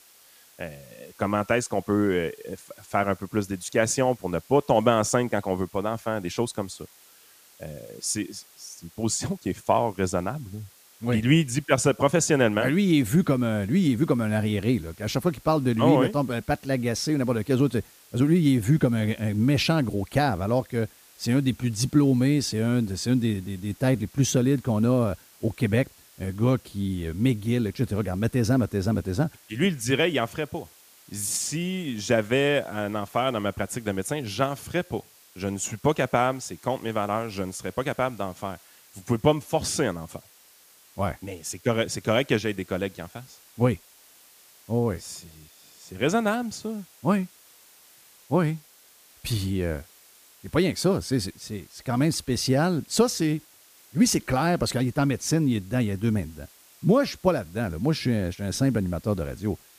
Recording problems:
hiss; faint; throughout; 25 dB below the speech

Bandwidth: 15 kHz